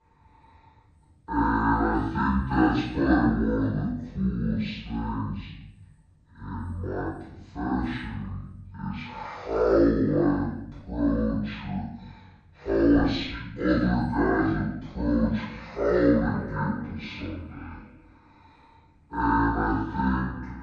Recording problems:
off-mic speech; far
wrong speed and pitch; too slow and too low; 0.5 times normal speed
room echo; noticeable; dies away in 0.7 s
echo of what is said; faint; from 16 s on; 470 ms later, 20 dB below the speech

